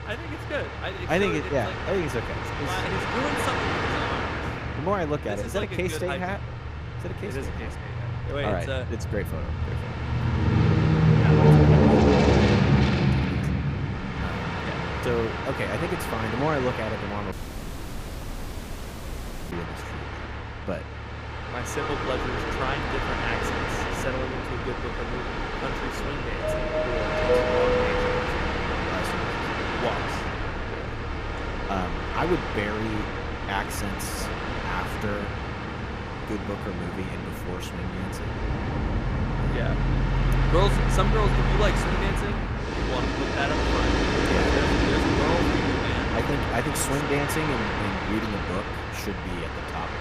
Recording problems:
train or aircraft noise; very loud; throughout; 5 dB above the speech
low rumble; faint; throughout; 25 dB below the speech
audio cutting out; at 17 s for 2 s

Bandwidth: 15 kHz